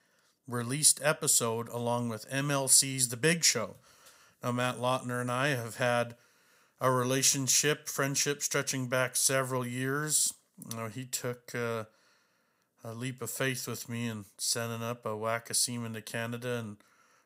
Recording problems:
none

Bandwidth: 15.5 kHz